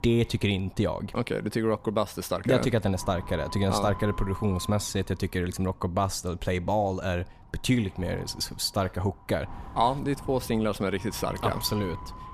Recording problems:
wind noise on the microphone; occasional gusts; 15 dB below the speech

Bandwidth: 14.5 kHz